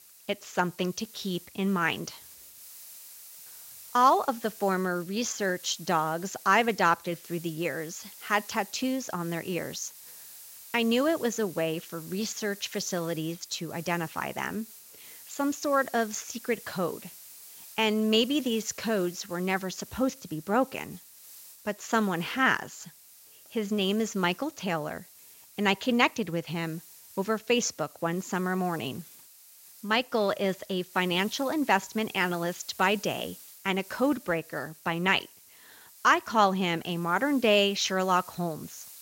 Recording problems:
garbled, watery; slightly; nothing above 7.5 kHz
hiss; noticeable; throughout; 20 dB below the speech

